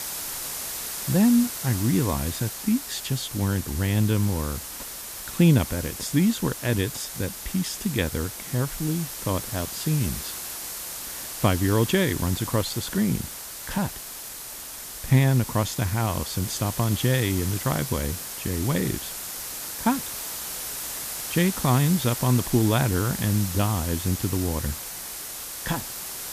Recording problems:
hiss; loud; throughout; 7 dB below the speech

